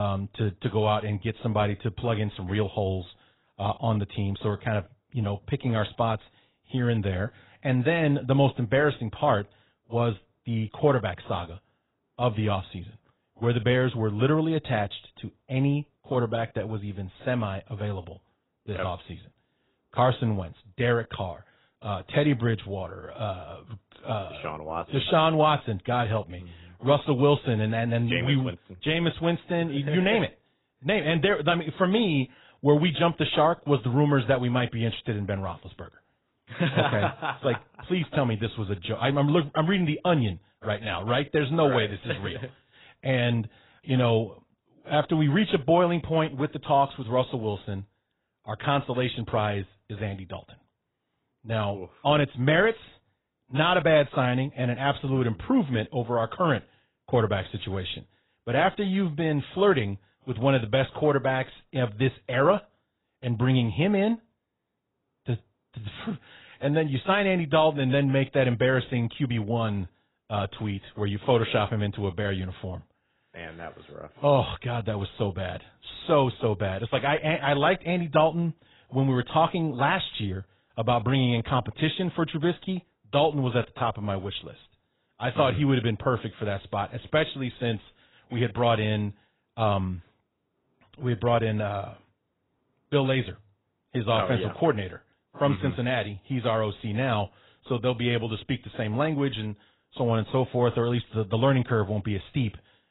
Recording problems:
garbled, watery; badly; nothing above 4 kHz
abrupt cut into speech; at the start

